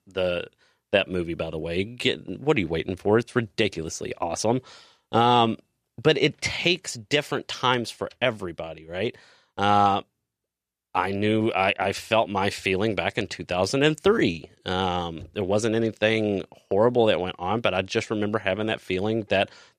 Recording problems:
none

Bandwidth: 14.5 kHz